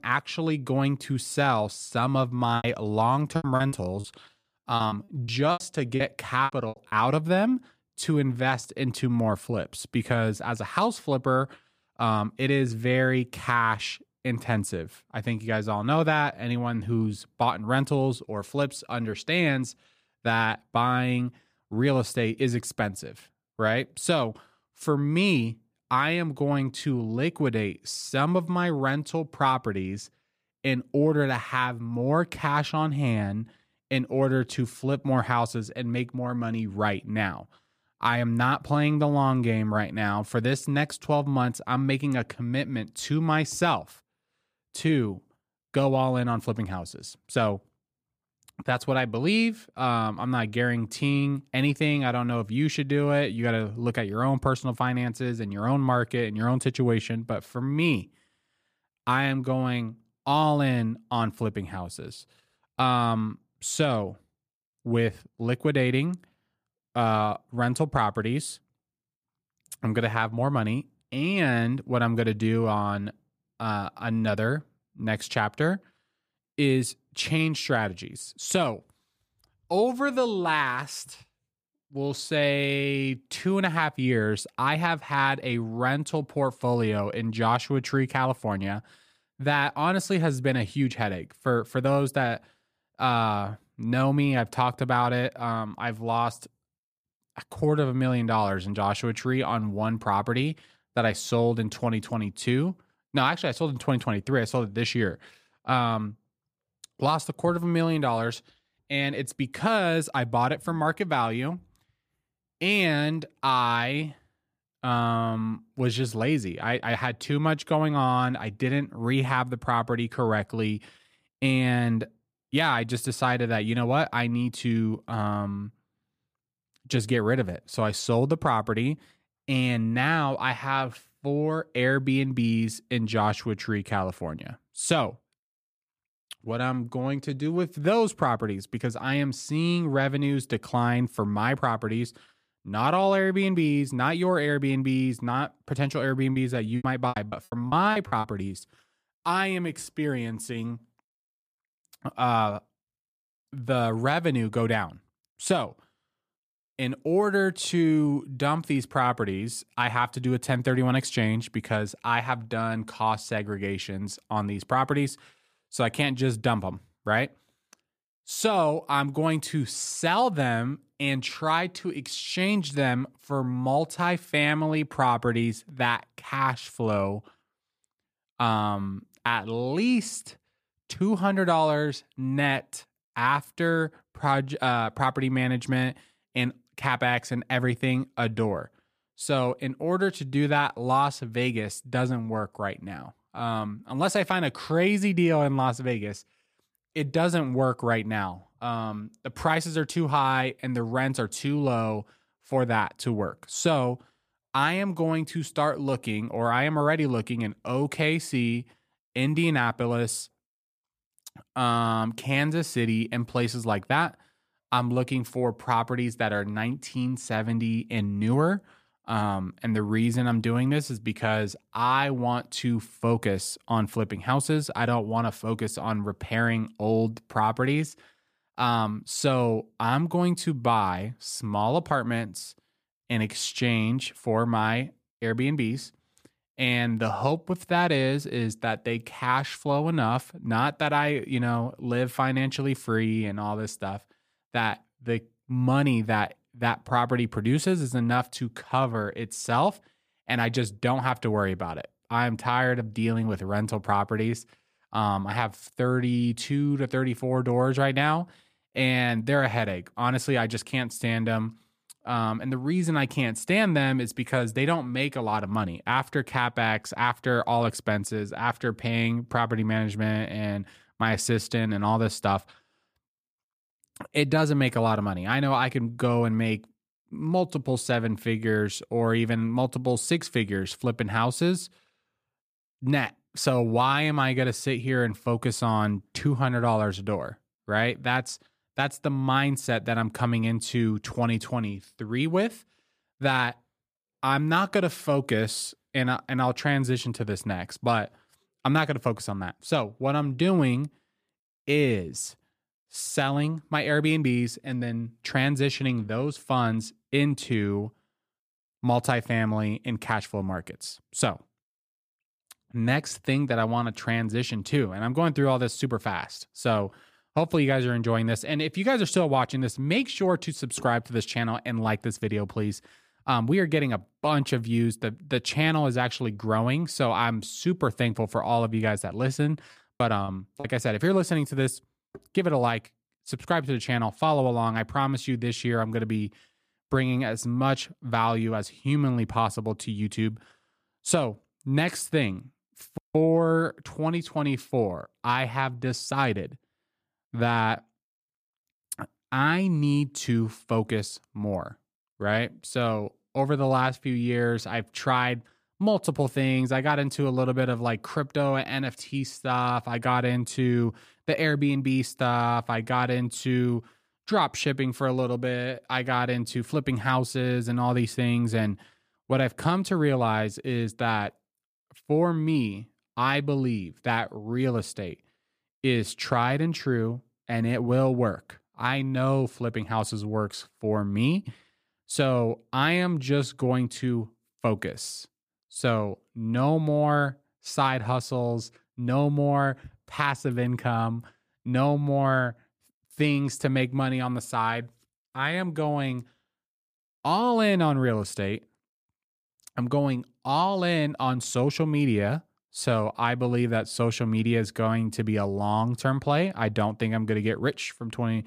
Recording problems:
choppy; very; from 2.5 to 7 s, from 2:26 to 2:28 and at 5:30; 17% of the speech affected

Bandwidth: 15 kHz